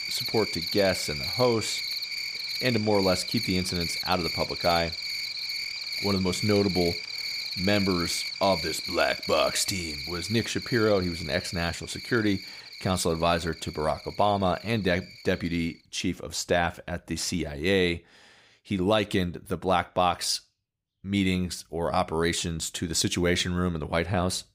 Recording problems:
animal sounds; loud; throughout; 4 dB below the speech

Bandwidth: 15.5 kHz